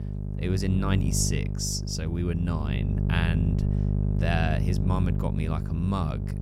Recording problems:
electrical hum; loud; throughout; 50 Hz, 6 dB below the speech

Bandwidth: 17 kHz